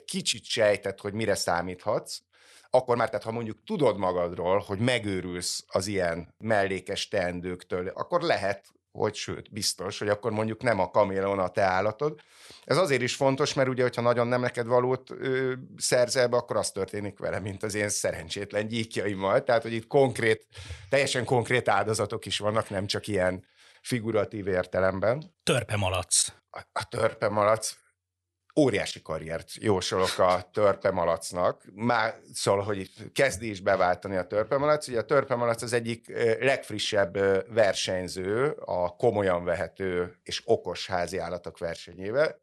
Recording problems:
uneven, jittery; strongly; from 2.5 to 38 s

